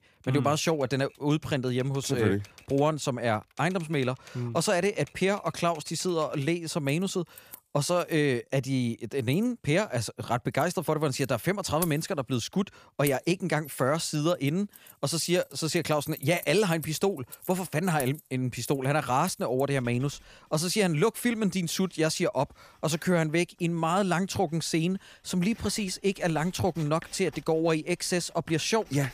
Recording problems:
household noises; noticeable; throughout; 20 dB below the speech

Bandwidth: 15 kHz